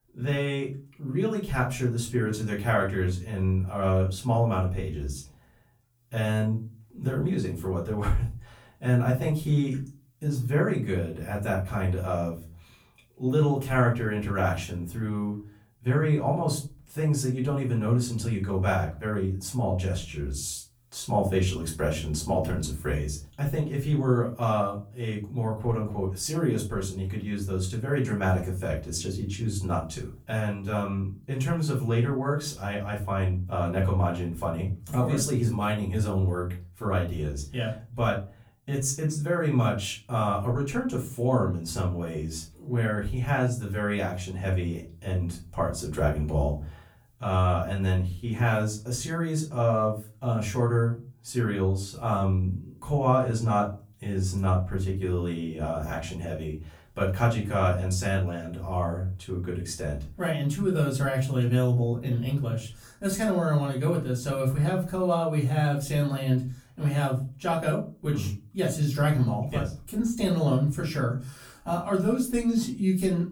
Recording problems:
off-mic speech; far
room echo; slight; dies away in 0.3 s

